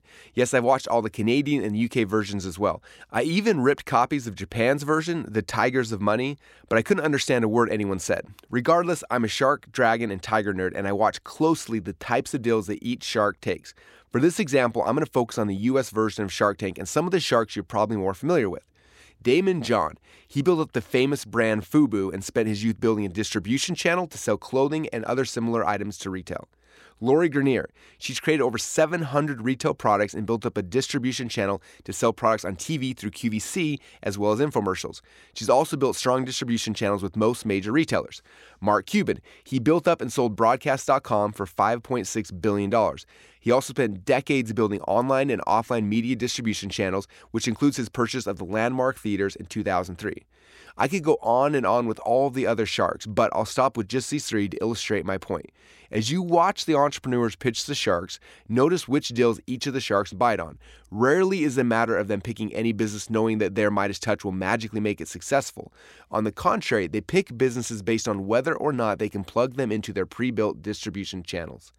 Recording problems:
none

